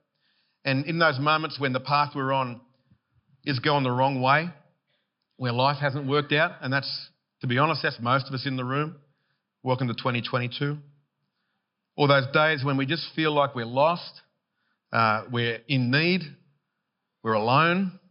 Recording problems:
high frequencies cut off; noticeable; nothing above 5.5 kHz

